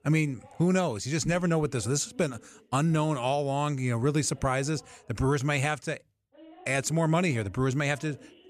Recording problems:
voice in the background; faint; throughout; 25 dB below the speech

